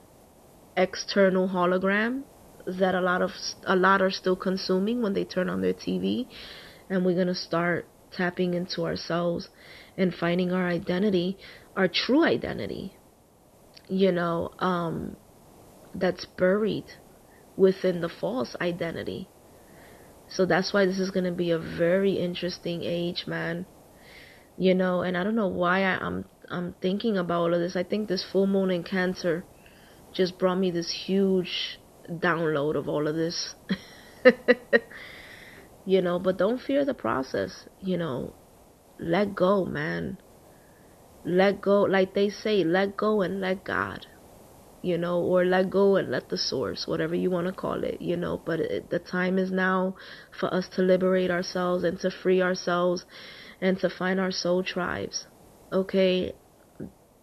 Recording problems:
high frequencies cut off; noticeable; nothing above 5.5 kHz
hiss; faint; throughout; 25 dB below the speech

